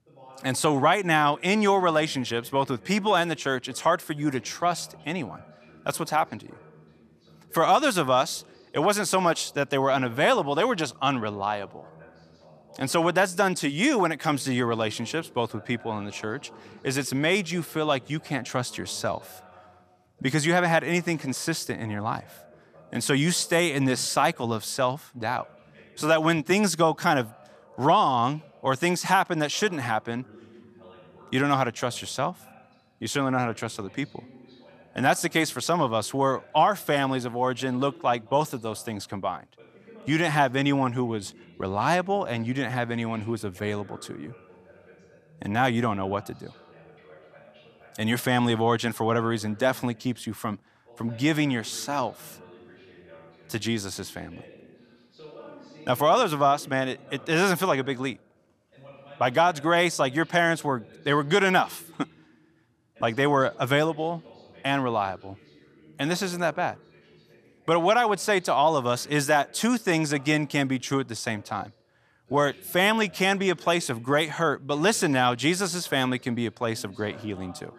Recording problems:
voice in the background; faint; throughout; 25 dB below the speech

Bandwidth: 14.5 kHz